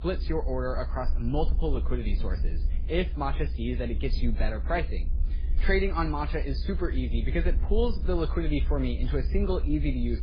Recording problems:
garbled, watery; badly; nothing above 5 kHz
low rumble; noticeable; throughout; 20 dB below the speech

